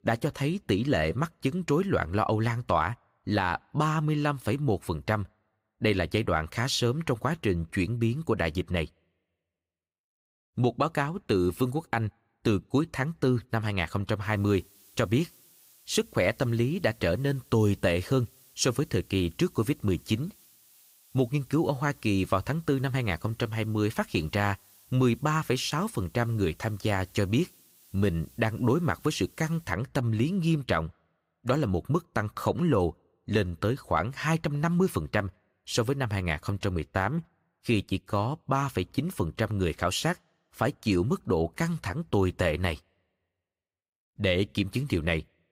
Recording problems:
hiss; faint; from 14 to 30 s; 25 dB below the speech

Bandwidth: 15.5 kHz